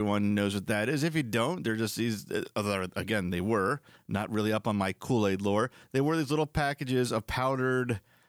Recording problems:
abrupt cut into speech; at the start

